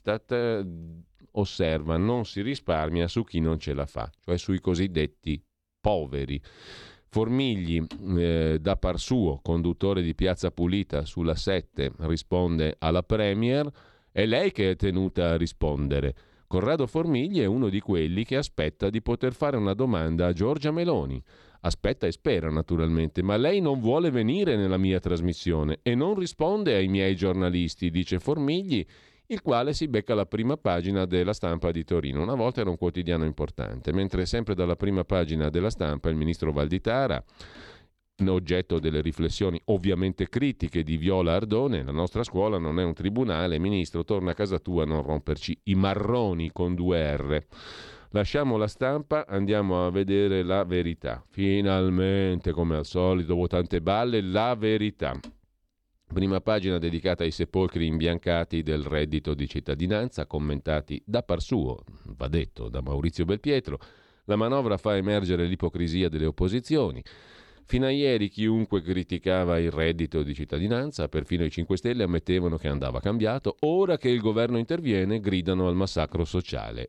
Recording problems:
none

